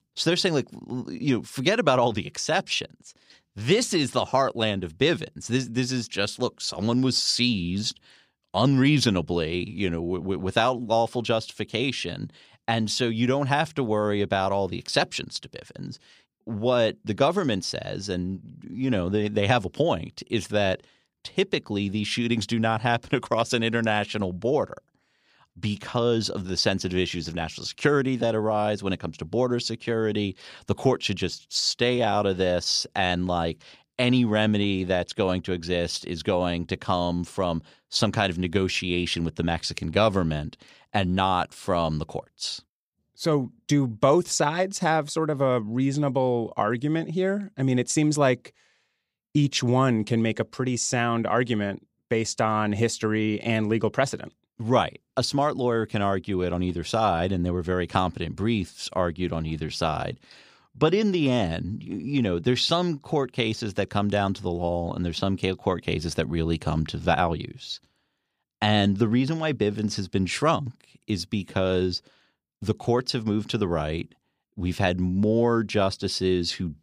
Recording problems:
none

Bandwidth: 15 kHz